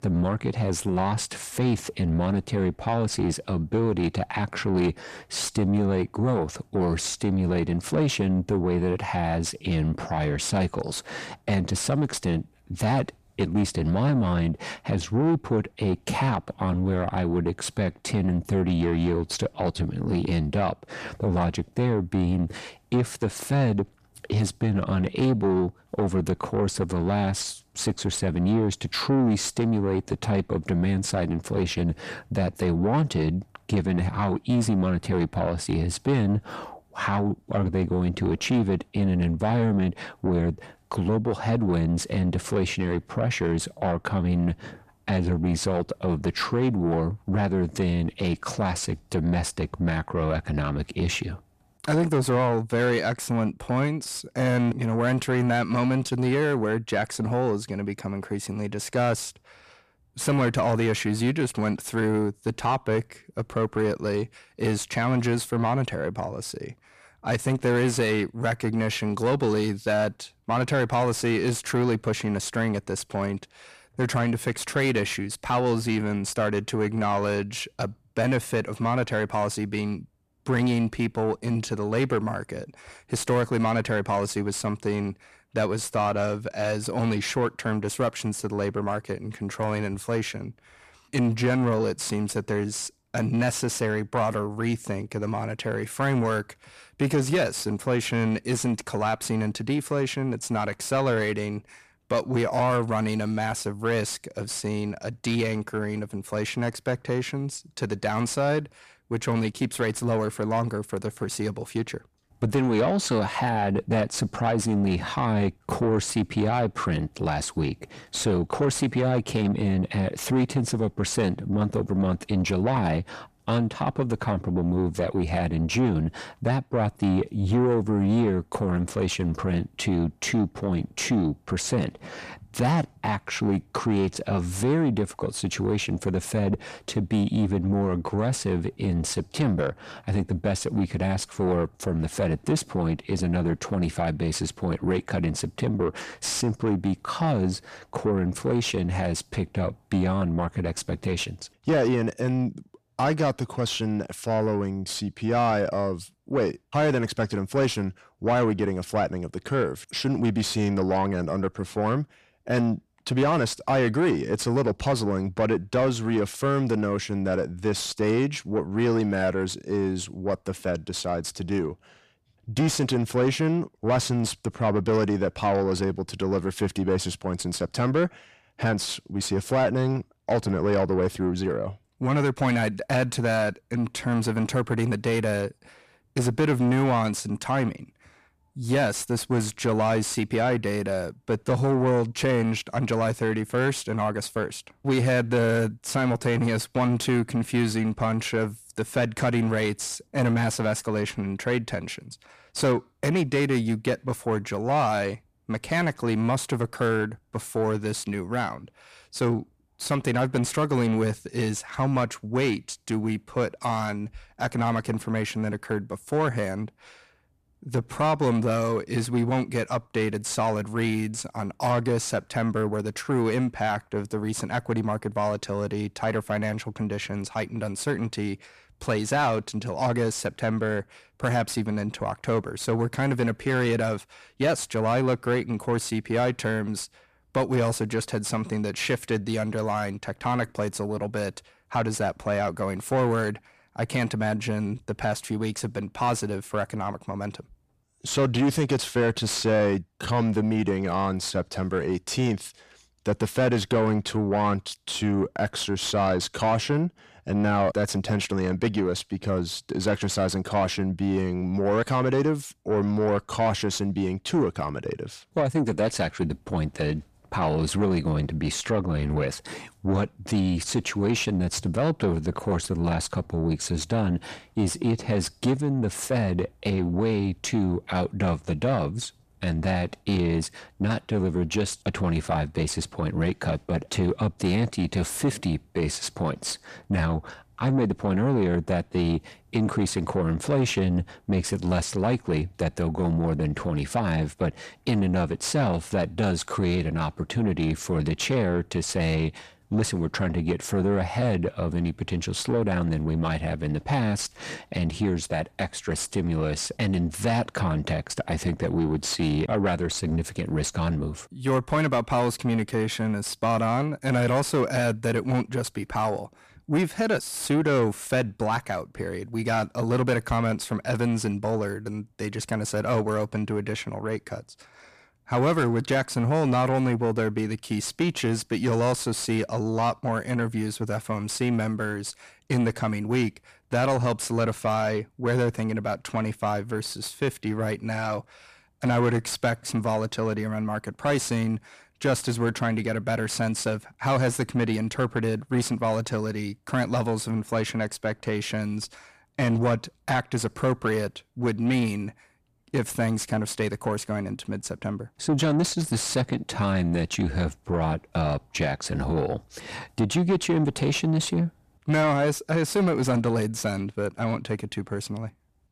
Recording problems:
distortion; slight; 10 dB below the speech

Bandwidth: 14.5 kHz